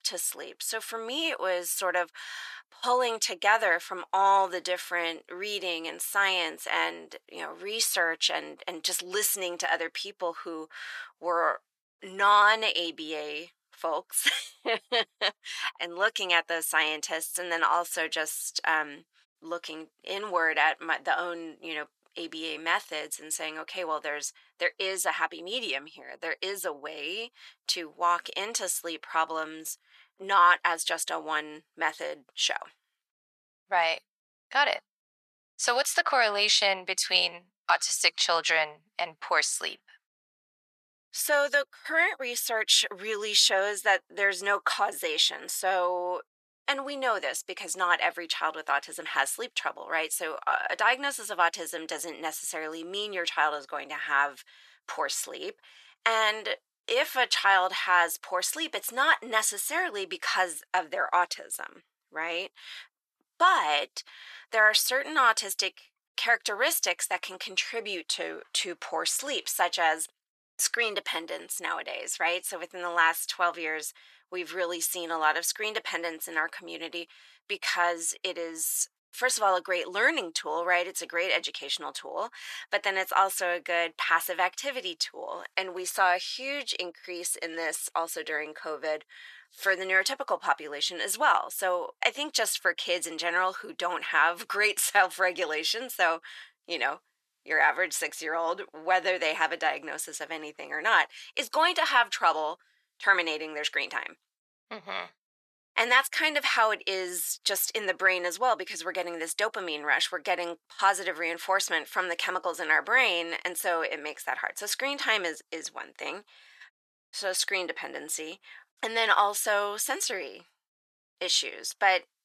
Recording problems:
thin; very; fading below 900 Hz

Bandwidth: 13.5 kHz